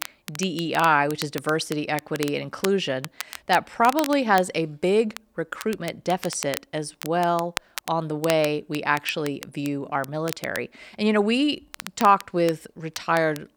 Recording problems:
crackle, like an old record; noticeable; 15 dB below the speech

